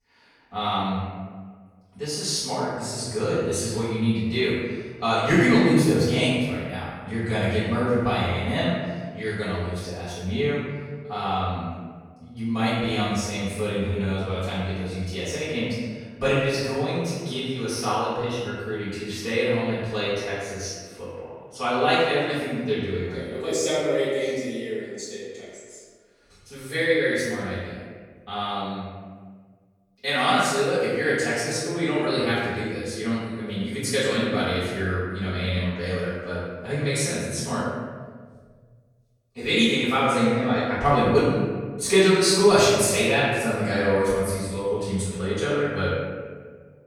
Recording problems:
room echo; strong; dies away in 1.5 s
off-mic speech; far

